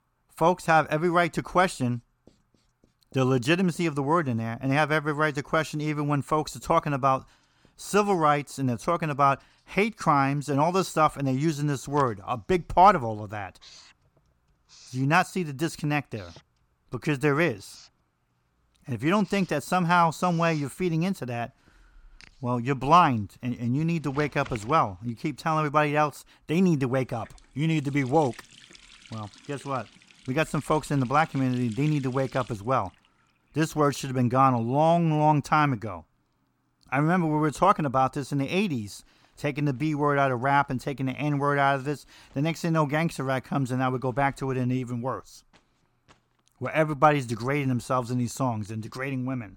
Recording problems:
household noises; faint; throughout; 25 dB below the speech

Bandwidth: 18 kHz